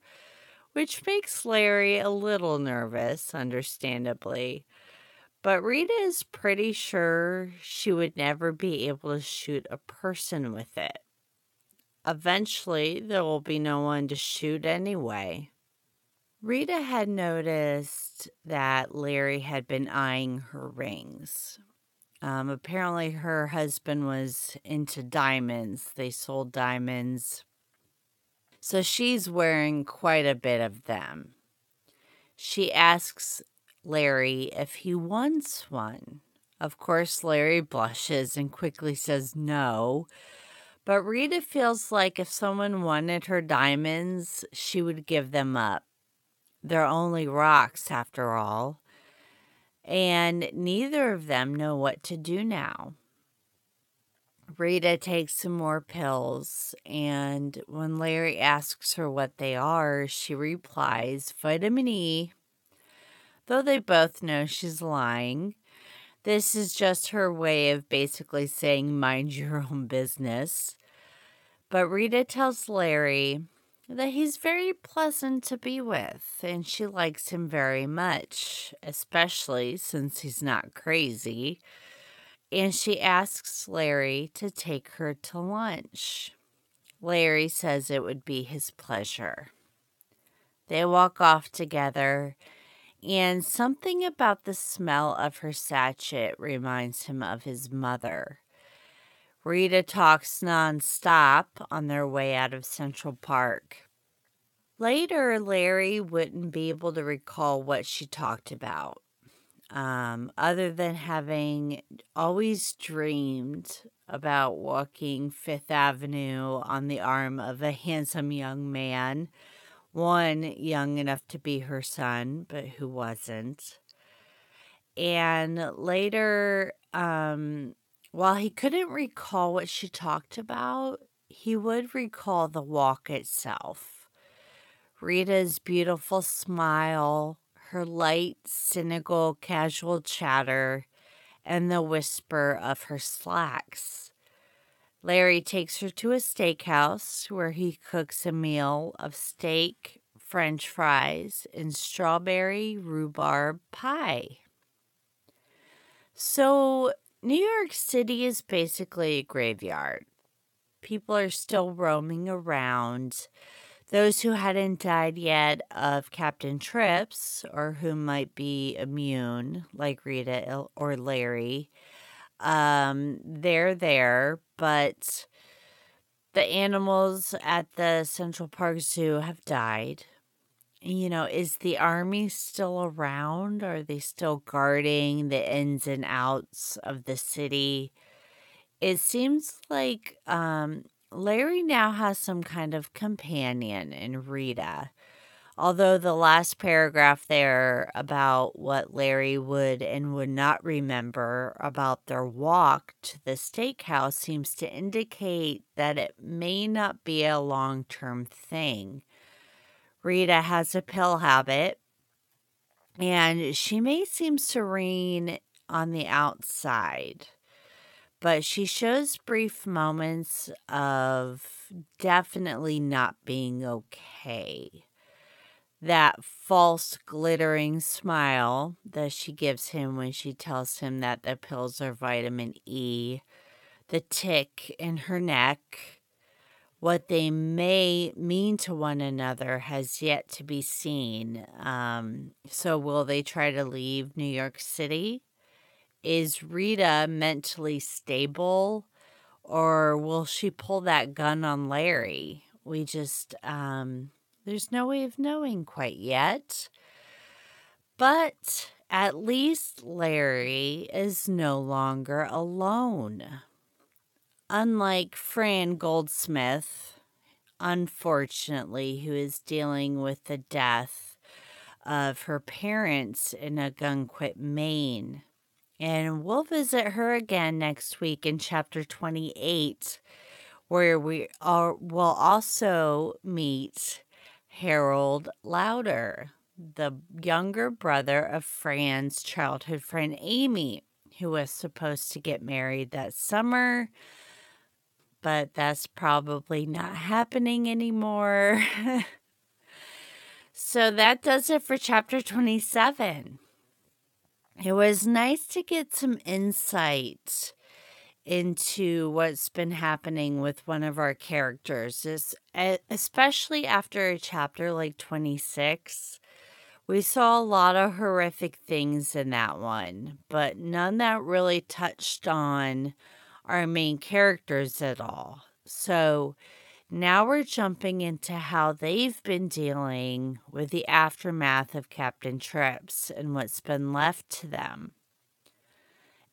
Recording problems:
wrong speed, natural pitch; too slow; 0.6 times normal speed

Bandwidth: 17 kHz